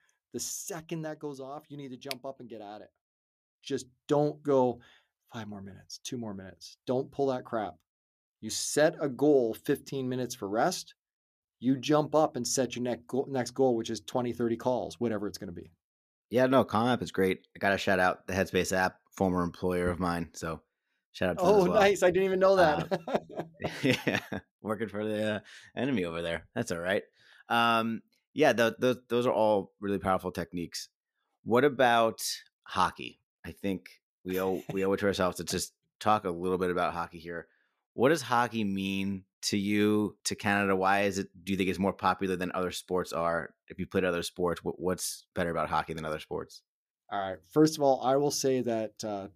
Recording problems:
none

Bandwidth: 14.5 kHz